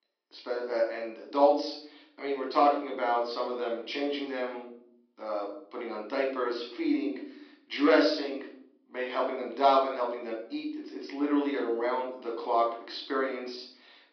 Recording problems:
room echo; noticeable; dies away in 0.5 s
thin; somewhat; fading below 300 Hz
high frequencies cut off; noticeable; nothing above 5.5 kHz
off-mic speech; somewhat distant

